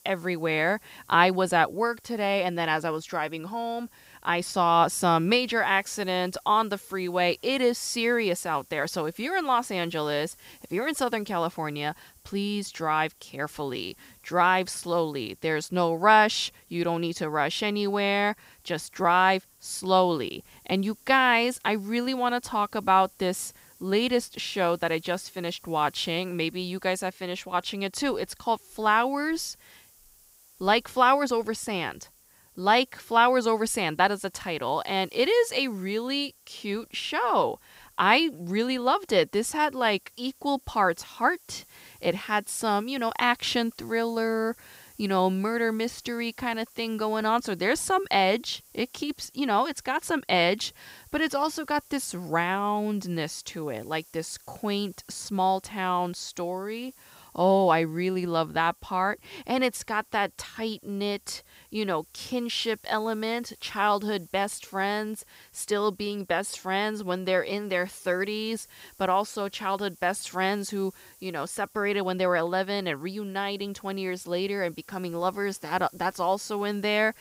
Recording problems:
hiss; faint; throughout; 25 dB below the speech

